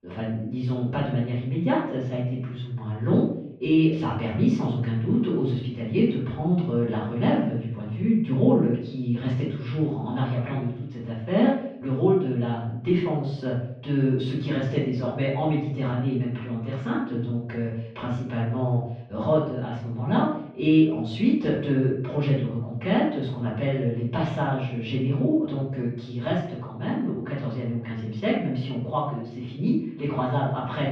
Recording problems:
off-mic speech; far
muffled; very; fading above 3 kHz
room echo; noticeable; dies away in 0.6 s

